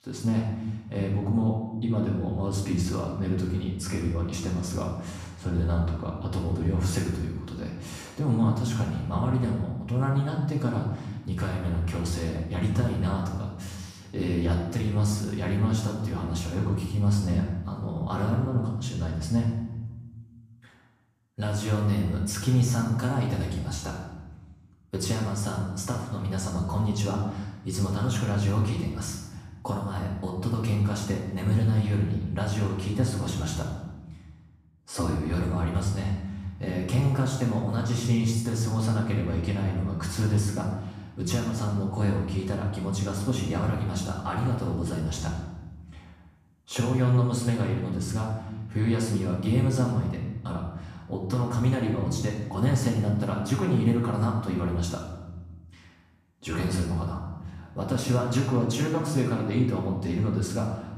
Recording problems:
off-mic speech; far
room echo; noticeable; dies away in 1 s

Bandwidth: 14.5 kHz